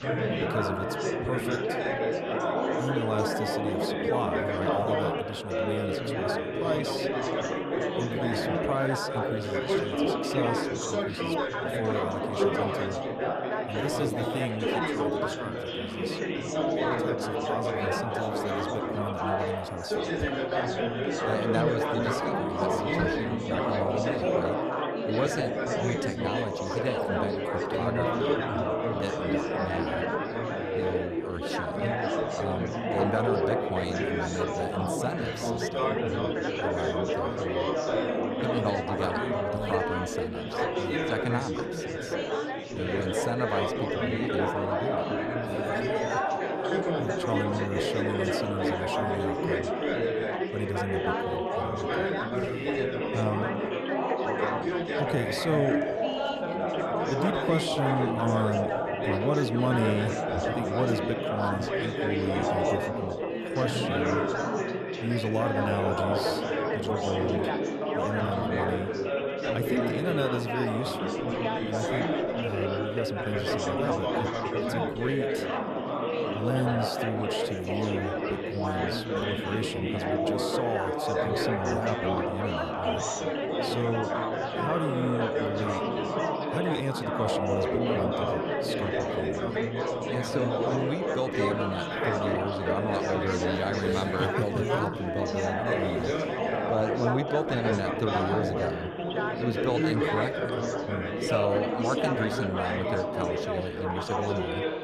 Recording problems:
chatter from many people; very loud; throughout; 5 dB above the speech

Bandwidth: 14 kHz